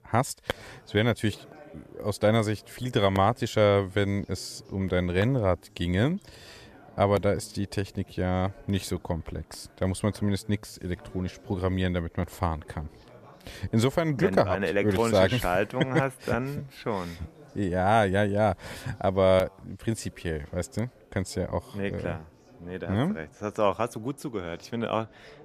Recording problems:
background chatter; faint; throughout; 2 voices, 25 dB below the speech

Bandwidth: 14.5 kHz